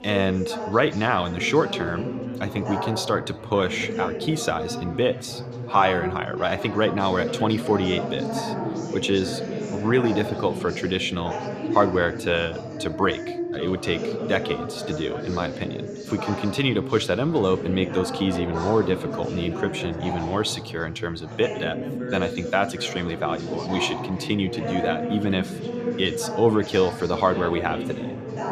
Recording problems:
background chatter; loud; throughout; 3 voices, 6 dB below the speech

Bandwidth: 14.5 kHz